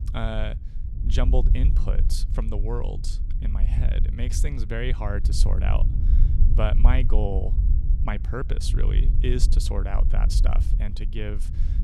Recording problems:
low rumble; loud; throughout; 10 dB below the speech

